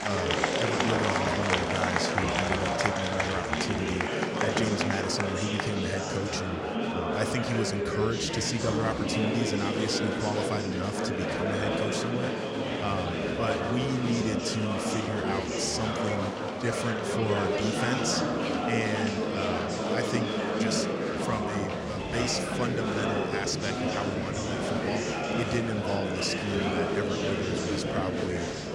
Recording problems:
murmuring crowd; very loud; throughout; 4 dB above the speech

